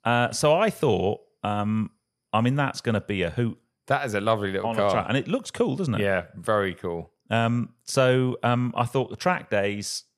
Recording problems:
none

